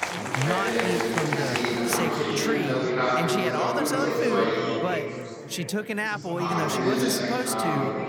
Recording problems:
murmuring crowd; very loud; throughout; 4 dB above the speech

